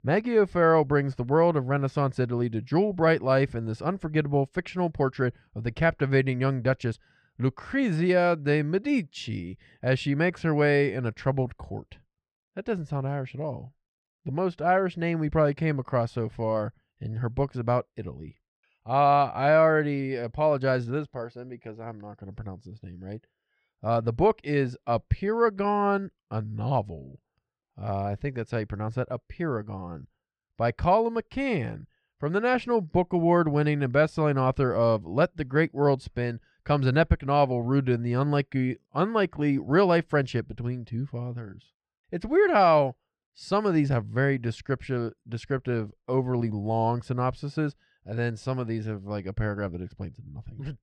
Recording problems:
muffled; slightly; fading above 2.5 kHz

